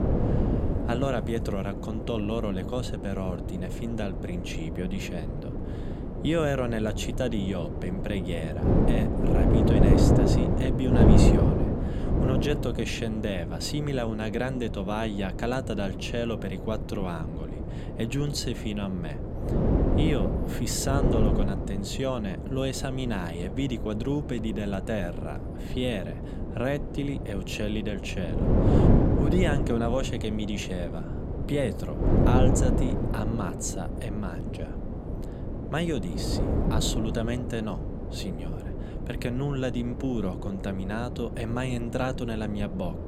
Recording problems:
wind noise on the microphone; heavy; 1 dB below the speech

